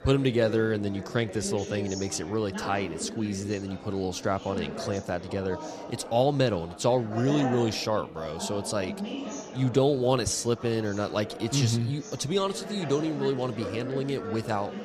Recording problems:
chatter from many people; loud; throughout; 10 dB below the speech

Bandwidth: 14 kHz